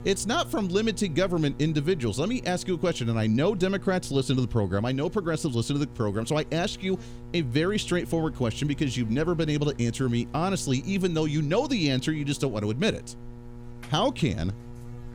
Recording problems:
electrical hum; faint; throughout; 60 Hz, 20 dB below the speech

